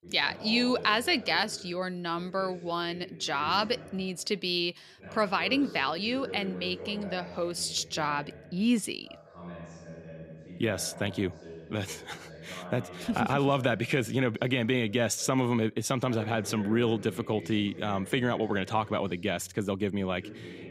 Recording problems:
voice in the background; noticeable; throughout; 15 dB below the speech

